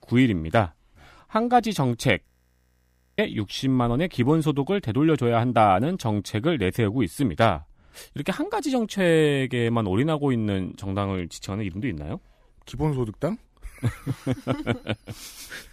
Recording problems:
audio freezing; at 2.5 s for 1 s

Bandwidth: 15 kHz